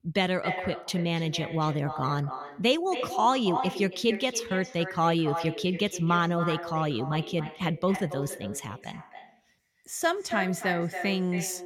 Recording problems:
echo of what is said; strong; throughout; 280 ms later, 9 dB below the speech

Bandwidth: 17 kHz